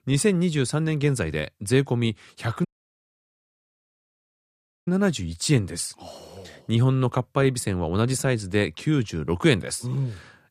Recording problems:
audio cutting out; at 2.5 s for 2 s

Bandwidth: 15 kHz